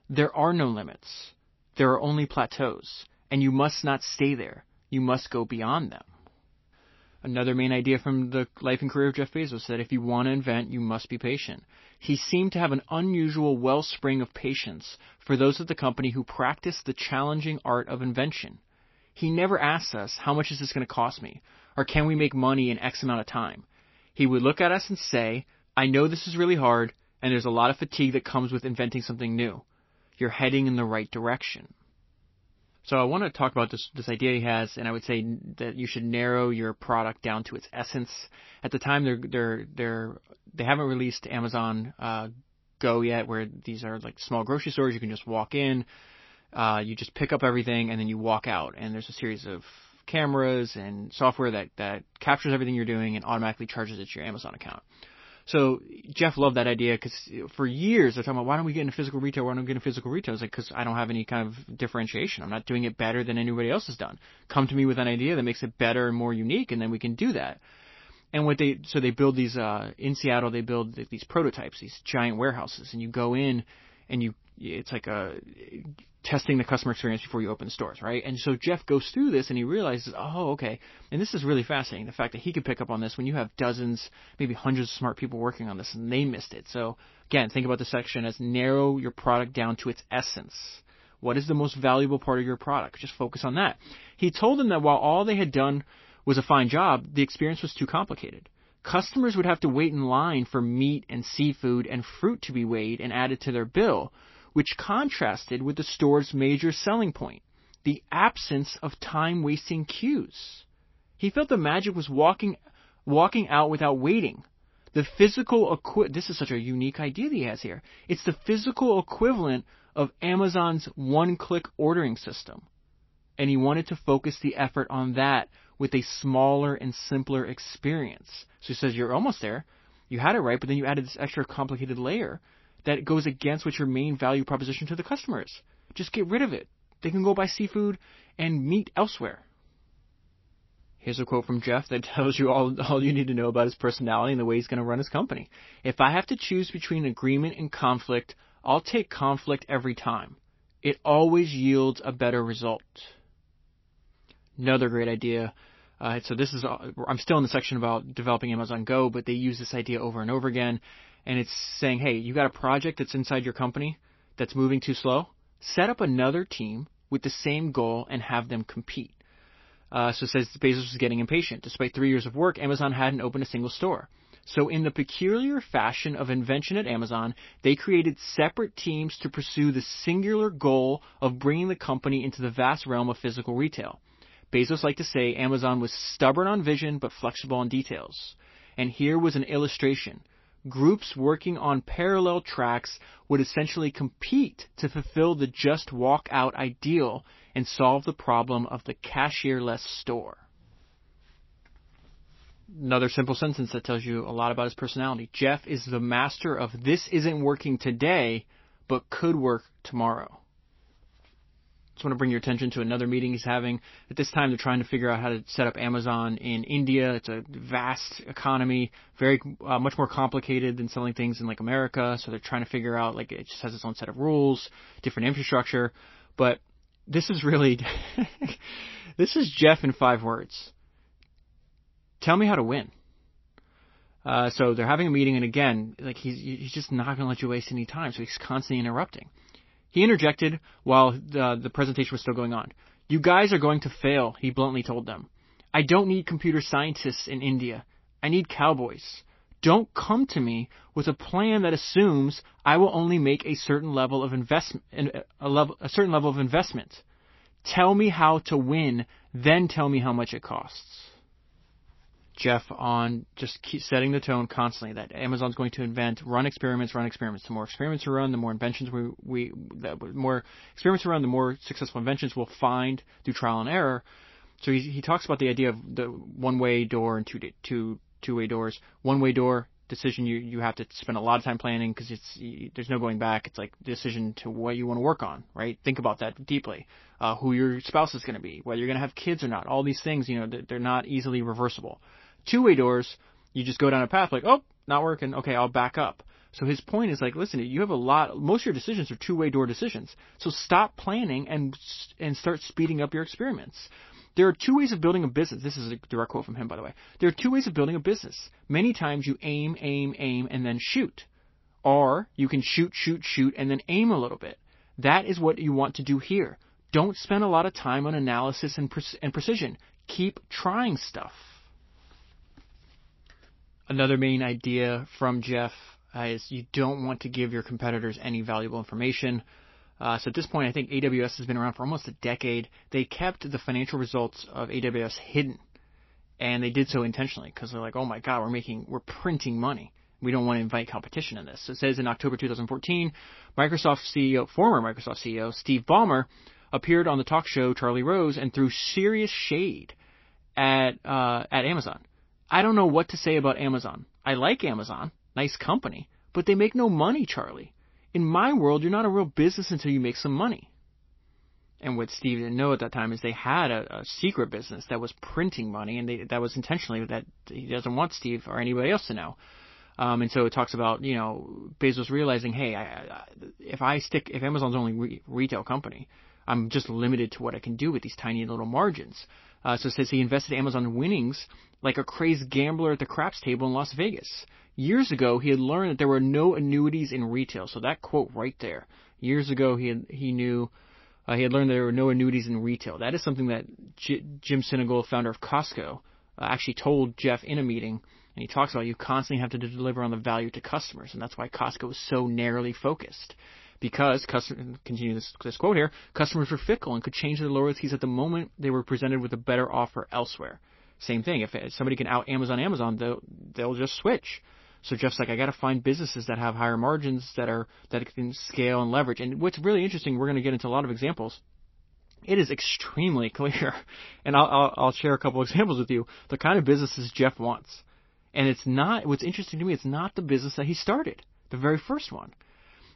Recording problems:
garbled, watery; slightly; nothing above 5.5 kHz

